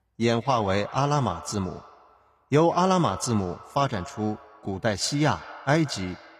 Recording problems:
echo of what is said; noticeable; throughout; 160 ms later, 15 dB below the speech

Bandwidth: 14.5 kHz